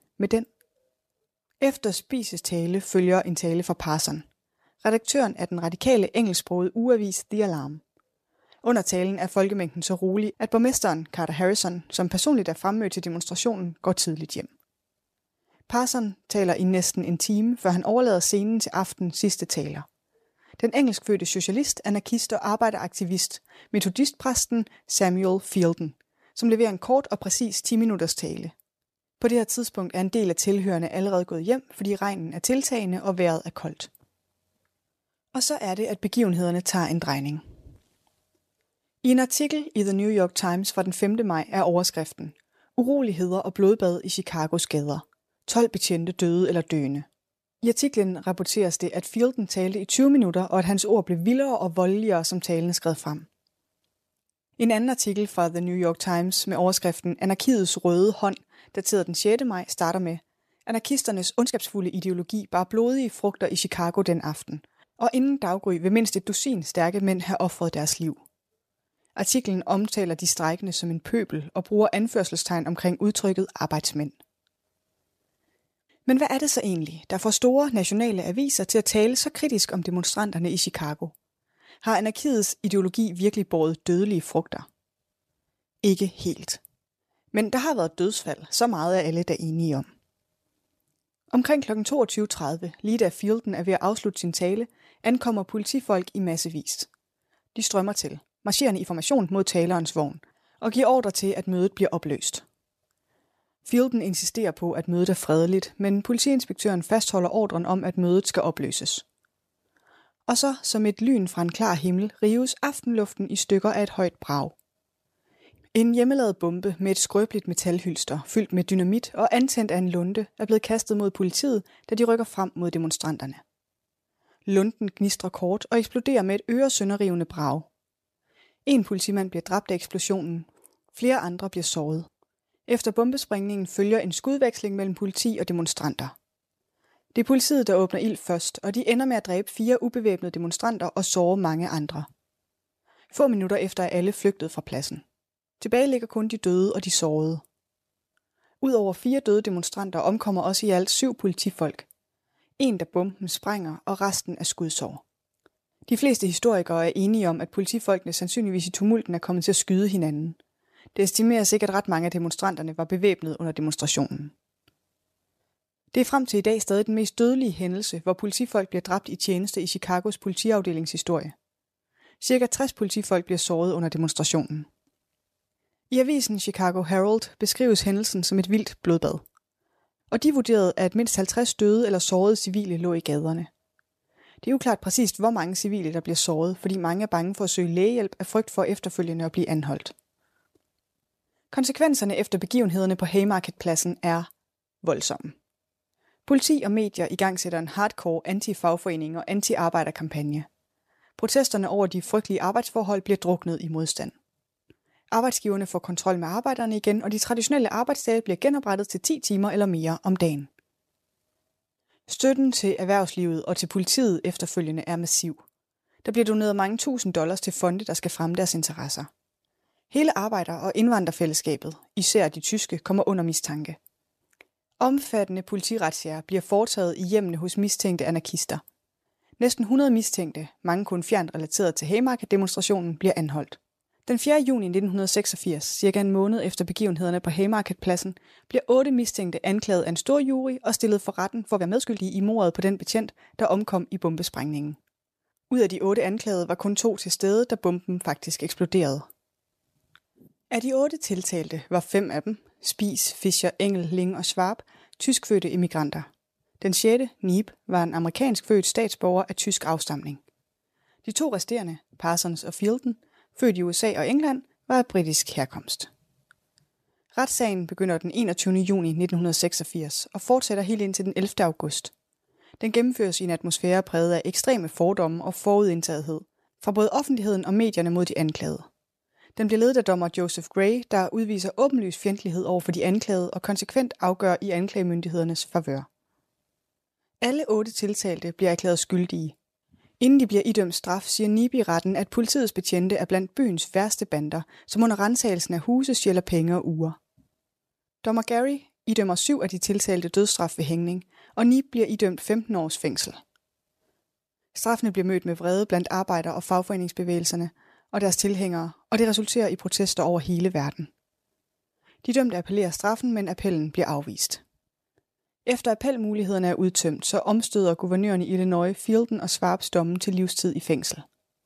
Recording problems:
uneven, jittery; strongly; from 1.5 s to 4:59

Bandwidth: 14.5 kHz